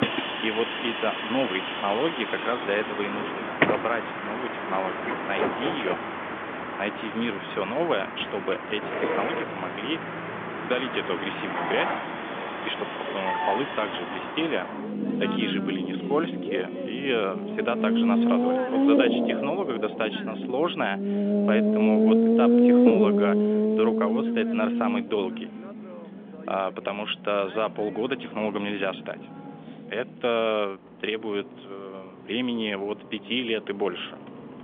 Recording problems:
phone-call audio; nothing above 3.5 kHz
traffic noise; very loud; throughout; 3 dB above the speech

